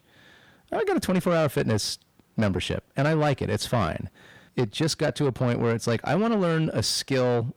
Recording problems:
distortion; slight; 10 dB below the speech

